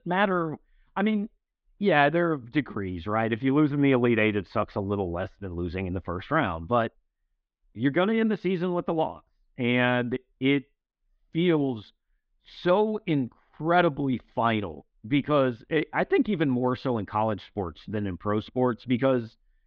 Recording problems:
muffled; very; fading above 3.5 kHz

